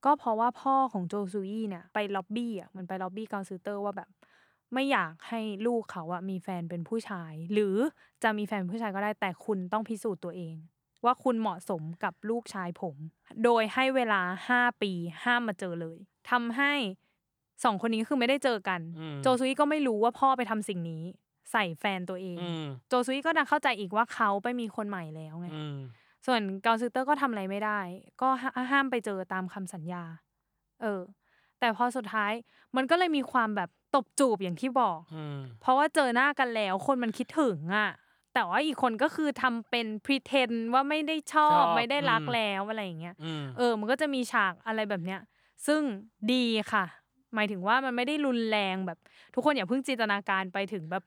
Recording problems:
none

